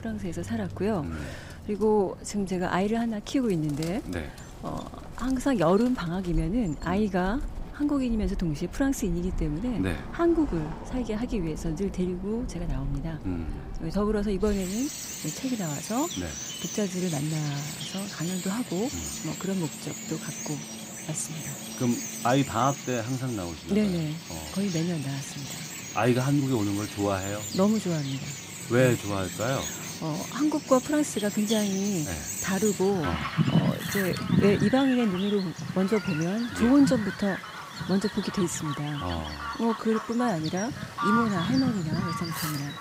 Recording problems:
animal sounds; loud; throughout; 7 dB below the speech

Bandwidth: 15.5 kHz